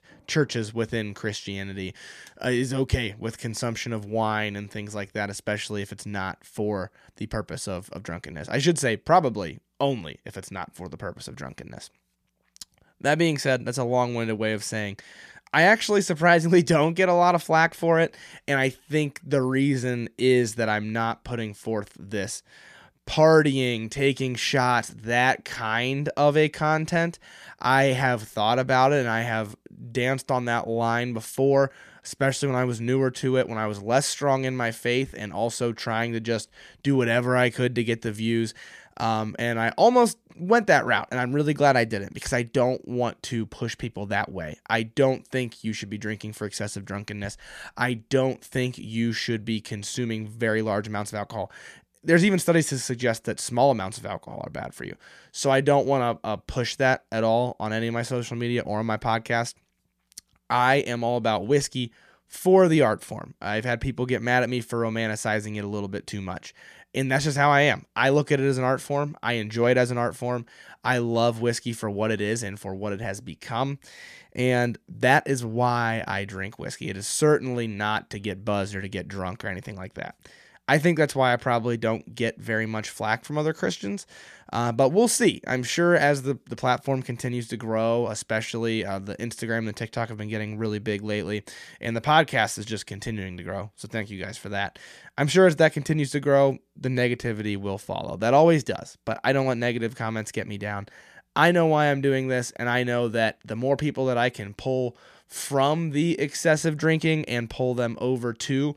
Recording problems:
none

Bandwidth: 14.5 kHz